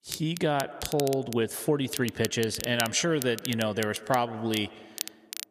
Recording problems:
echo of what is said; noticeable; throughout; 160 ms later, 20 dB below the speech
crackle, like an old record; noticeable; 10 dB below the speech

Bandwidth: 14.5 kHz